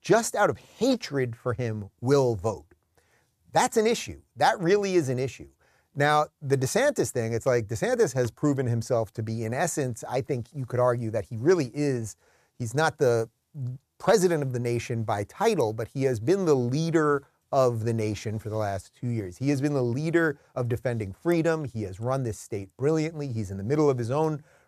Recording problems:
none

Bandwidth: 14.5 kHz